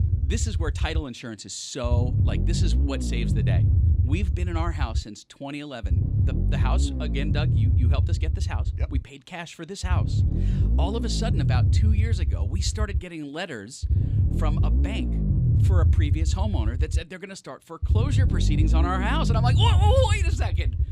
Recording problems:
low rumble; loud; throughout; 6 dB below the speech

